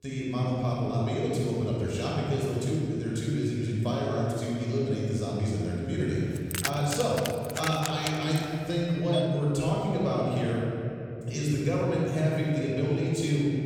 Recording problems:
room echo; strong; dies away in 3 s
off-mic speech; far
jangling keys; noticeable; from 6.5 to 8.5 s; peak 3 dB below the speech
doorbell; noticeable; from 9 to 10 s; peak 6 dB below the speech

